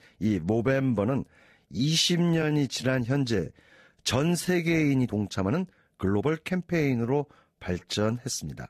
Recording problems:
garbled, watery; slightly; nothing above 14.5 kHz
uneven, jittery; strongly; from 0.5 to 8 s

